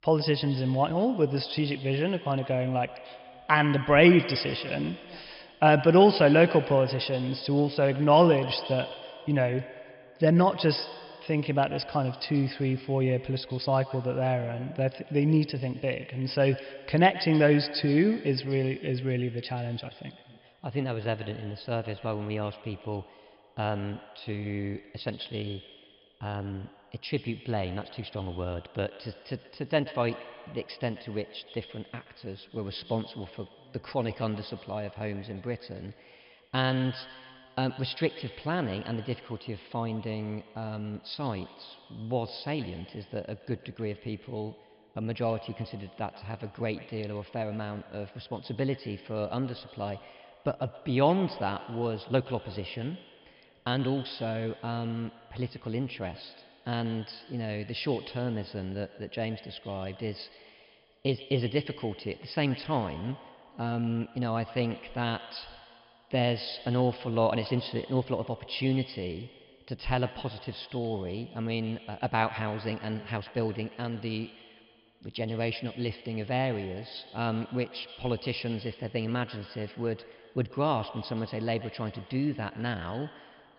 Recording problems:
echo of what is said; noticeable; throughout; 130 ms later, 15 dB below the speech
high frequencies cut off; noticeable; nothing above 5.5 kHz

